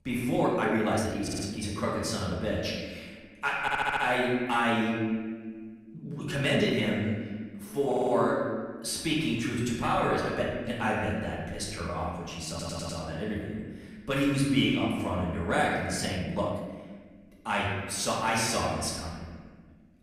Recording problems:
off-mic speech; far
room echo; noticeable; dies away in 1.5 s
uneven, jittery; strongly; from 0.5 to 17 s
audio stuttering; 4 times, first at 1 s

